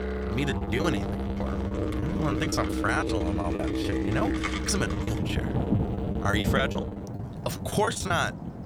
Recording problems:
background music; loud; throughout; 1 dB below the speech
rain or running water; loud; throughout; 3 dB below the speech
choppy; very; 17% of the speech affected

